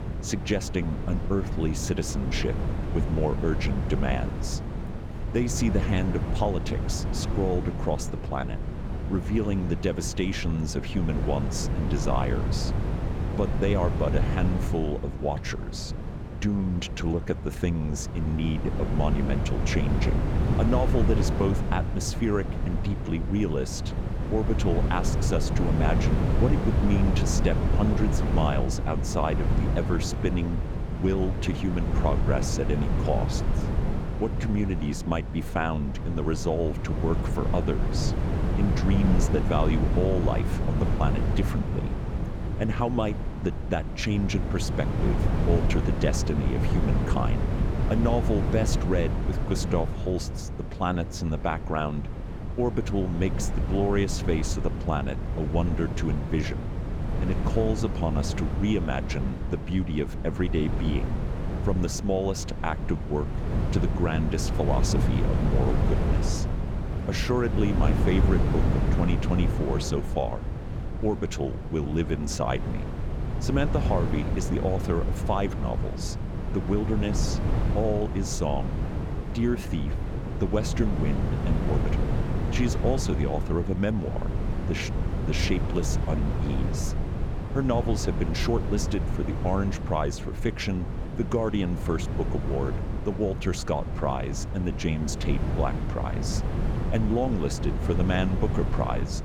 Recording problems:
wind noise on the microphone; heavy; 5 dB below the speech

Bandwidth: 18 kHz